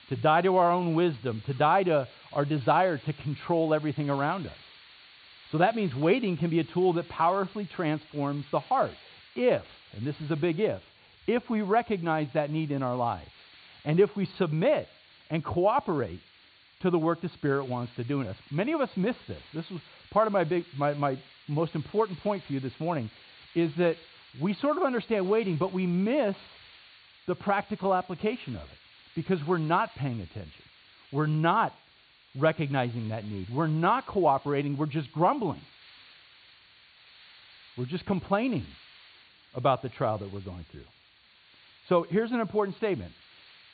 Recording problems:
high frequencies cut off; severe; nothing above 4.5 kHz
hiss; faint; throughout; 25 dB below the speech

